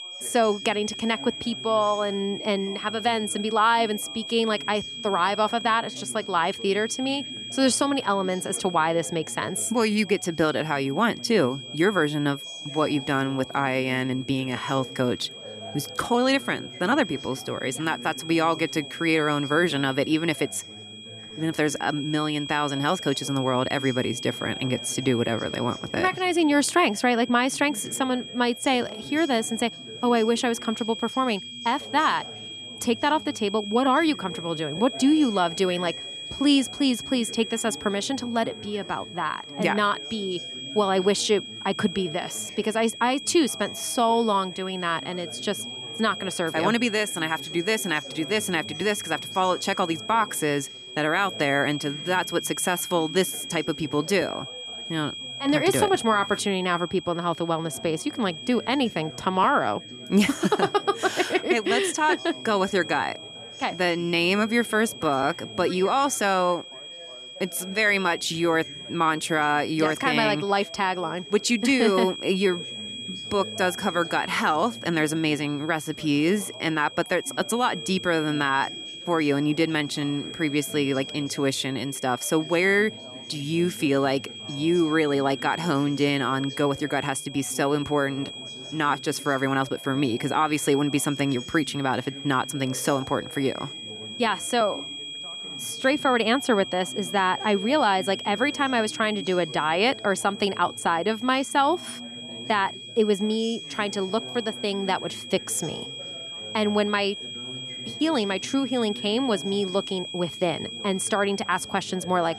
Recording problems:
high-pitched whine; noticeable; throughout; 3.5 kHz, 10 dB below the speech
background chatter; faint; throughout; 3 voices, 20 dB below the speech

